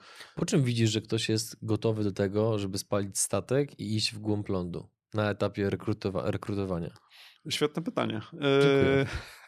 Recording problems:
none

